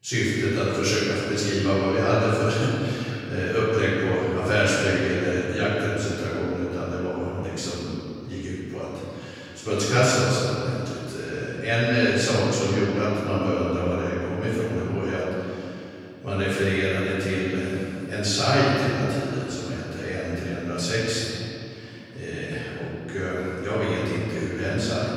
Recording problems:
room echo; strong; dies away in 2.8 s
off-mic speech; far

